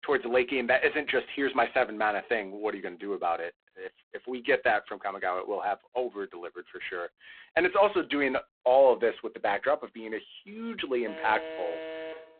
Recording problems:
phone-call audio; poor line
alarm; noticeable; from 11 s on; peak 9 dB below the speech

